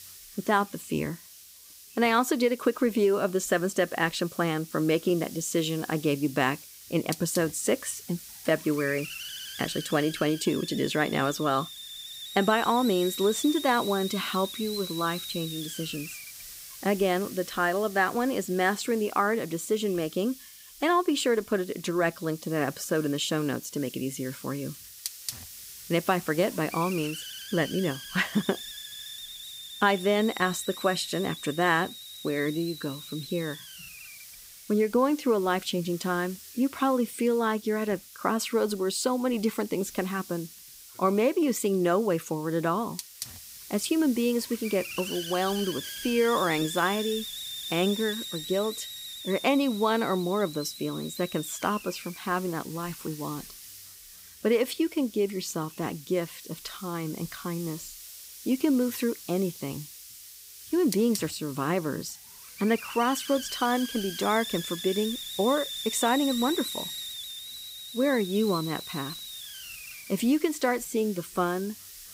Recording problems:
hiss; noticeable; throughout; 10 dB below the speech

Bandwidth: 15.5 kHz